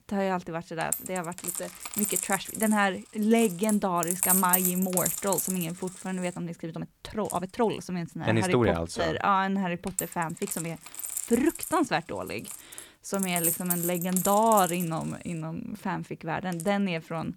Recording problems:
household noises; loud; throughout; 2 dB below the speech
uneven, jittery; strongly; from 3 to 14 s

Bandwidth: 18 kHz